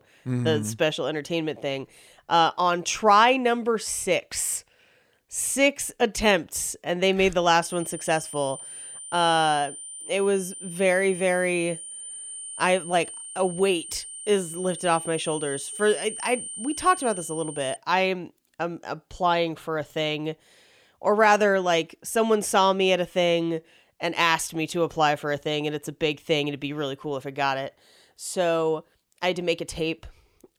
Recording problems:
high-pitched whine; noticeable; from 7.5 to 18 s; 9 kHz, 10 dB below the speech

